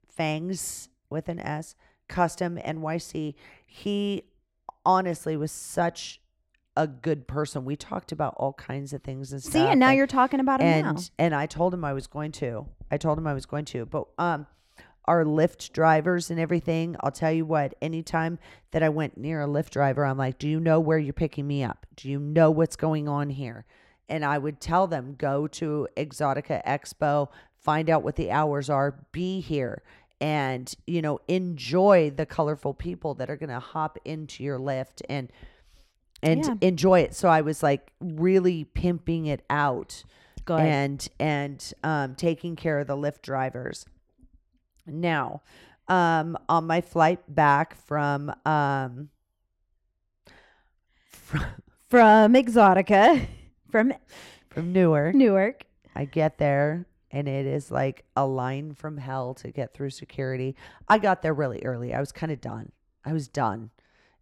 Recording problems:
muffled; slightly; fading above 2 kHz

